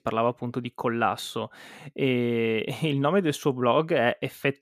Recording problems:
none

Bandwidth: 14.5 kHz